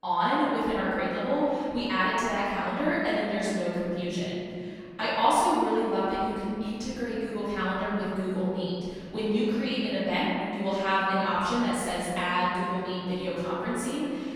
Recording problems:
room echo; strong; dies away in 2.5 s
off-mic speech; far

